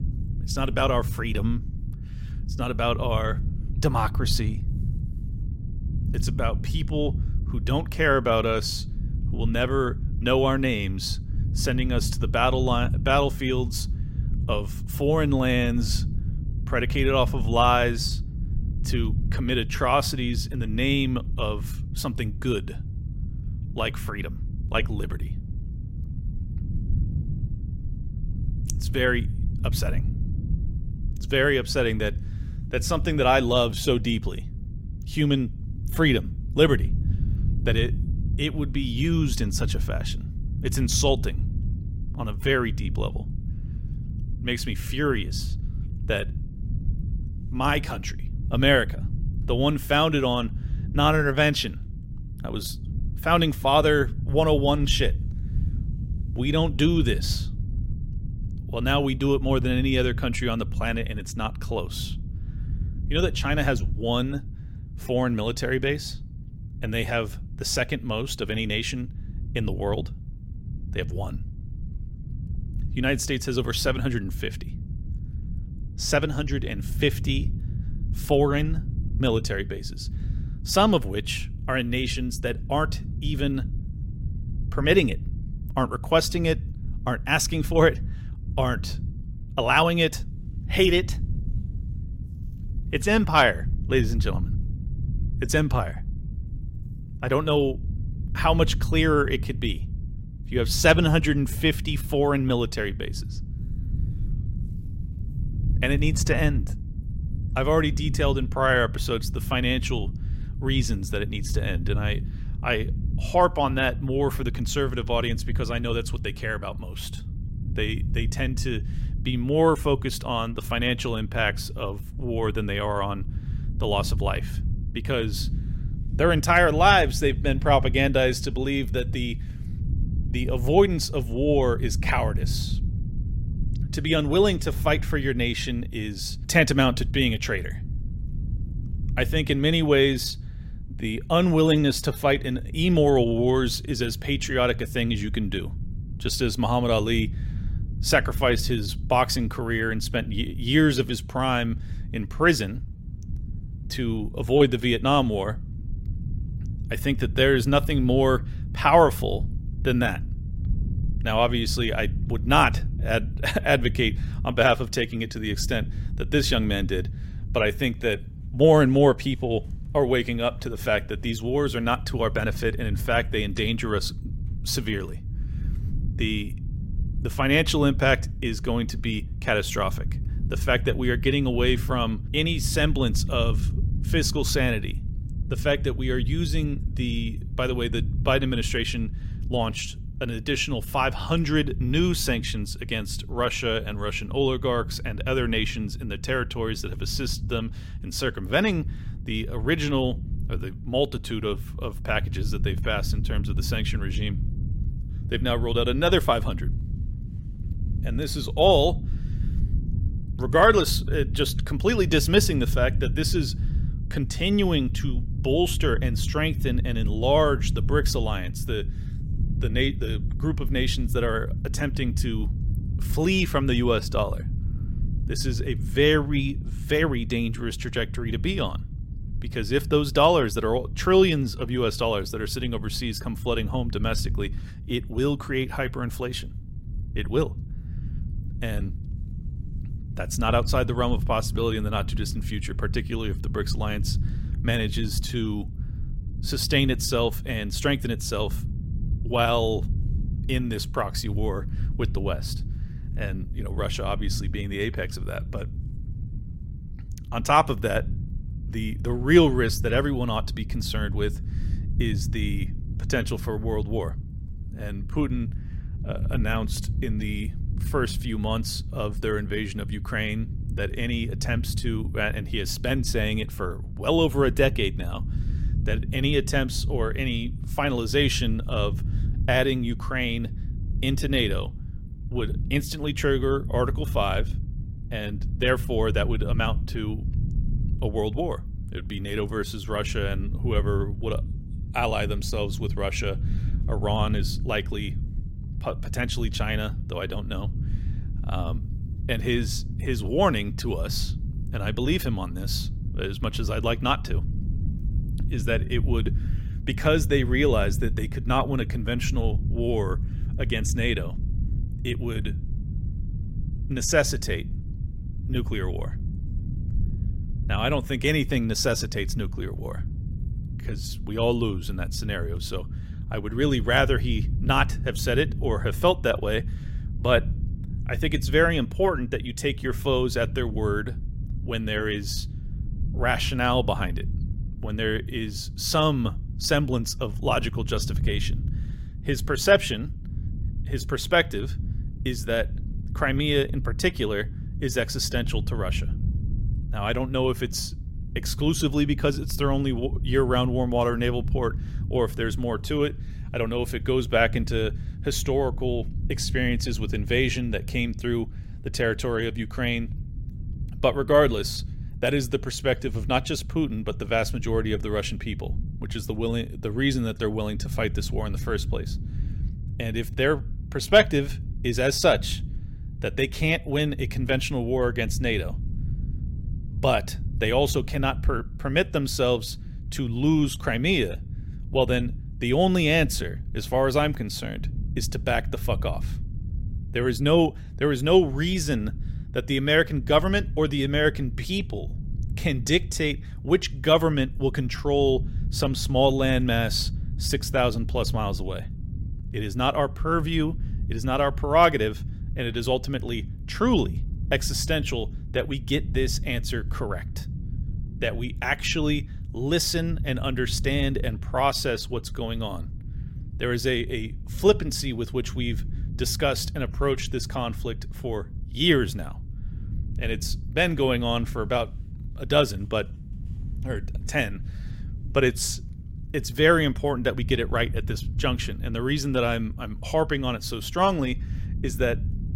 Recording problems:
low rumble; noticeable; throughout; 20 dB below the speech

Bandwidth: 16 kHz